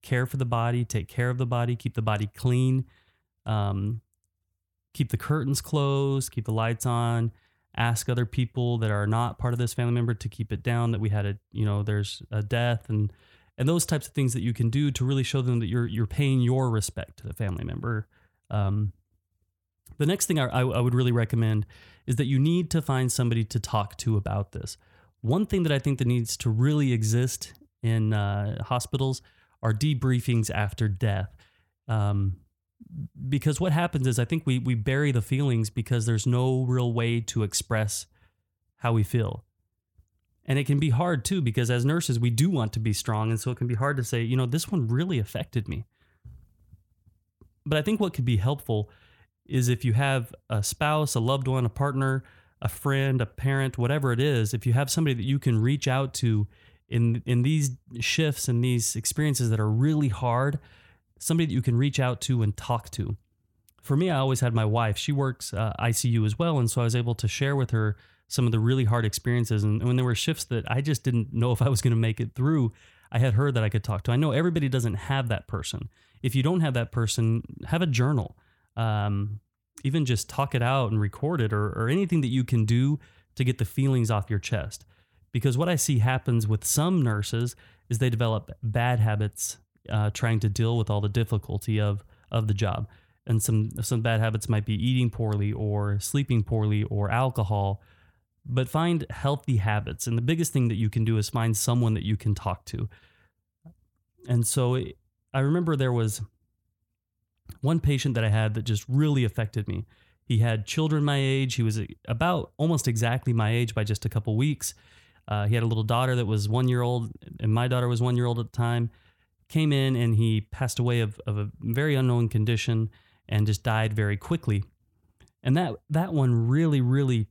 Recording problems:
none

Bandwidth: 17.5 kHz